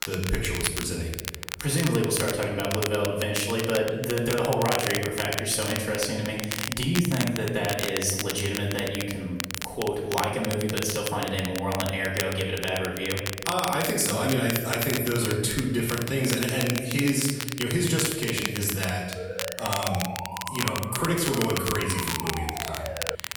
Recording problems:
off-mic speech; far
room echo; noticeable; dies away in 1.1 s
crackle, like an old record; loud; 6 dB below the speech
siren; noticeable; from 19 s on; peak 8 dB below the speech

